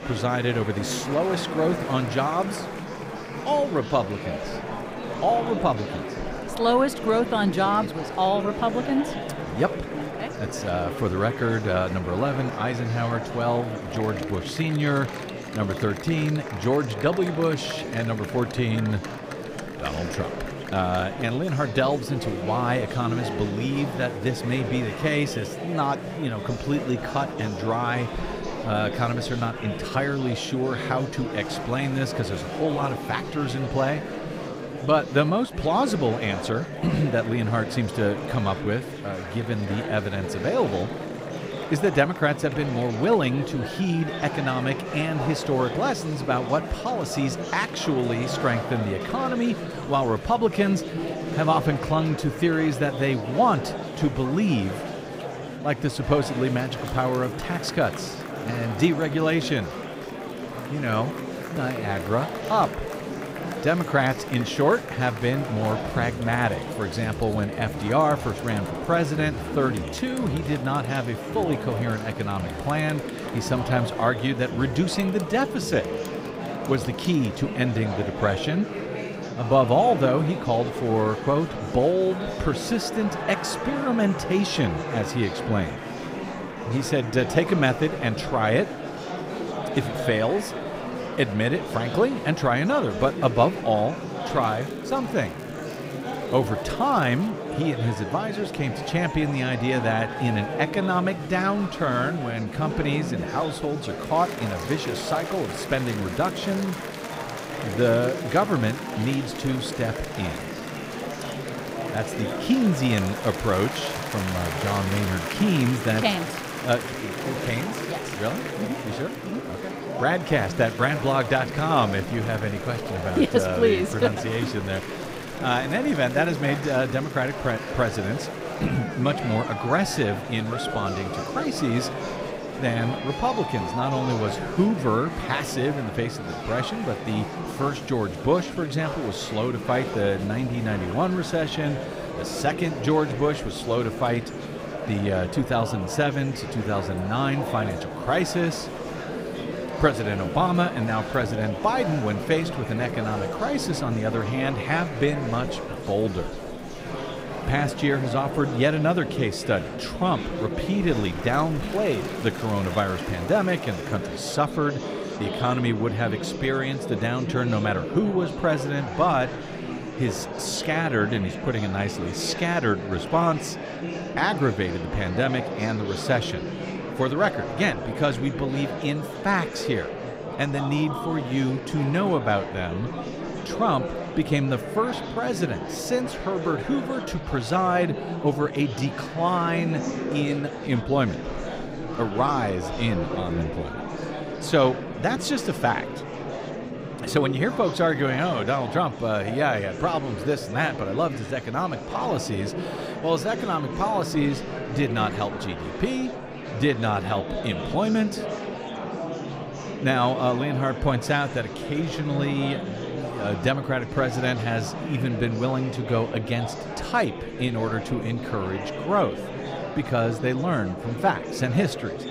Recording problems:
murmuring crowd; loud; throughout; 6 dB below the speech
crackling; faint; from 1:34 to 1:37; 30 dB below the speech

